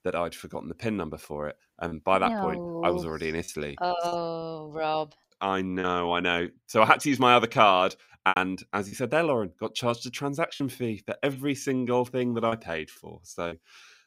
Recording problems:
choppy; occasionally; 4% of the speech affected

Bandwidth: 15.5 kHz